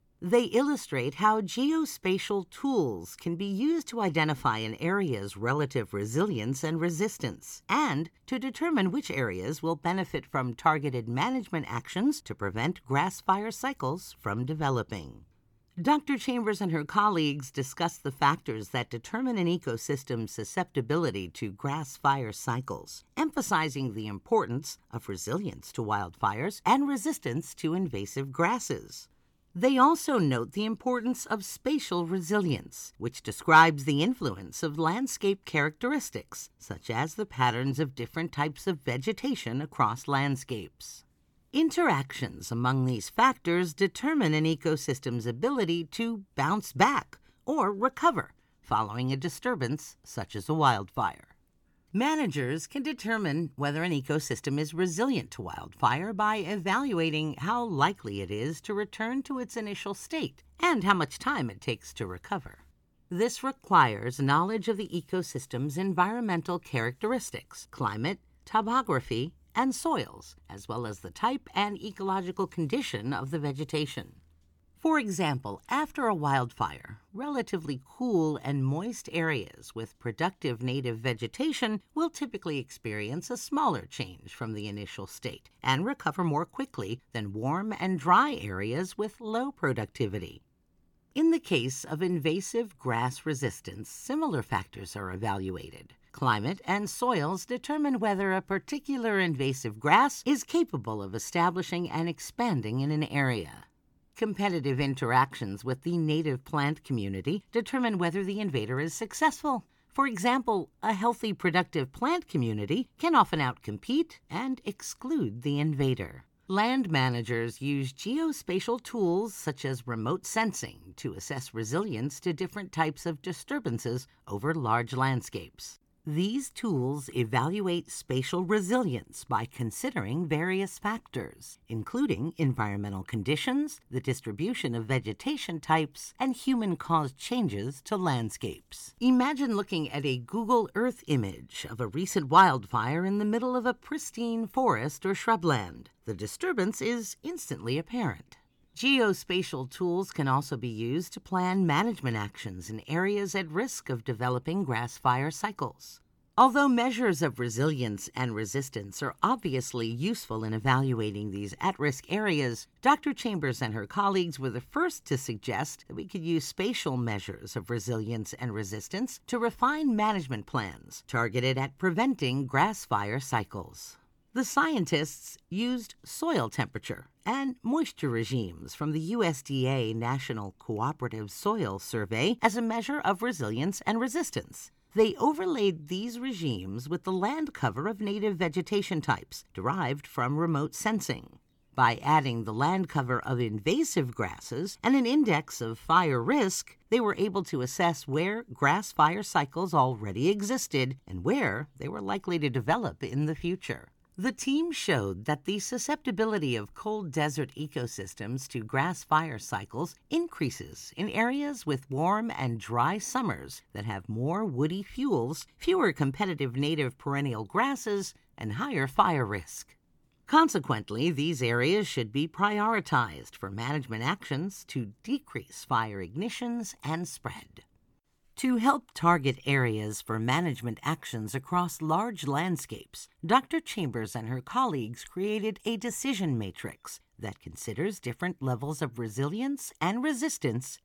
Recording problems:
none

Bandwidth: 18 kHz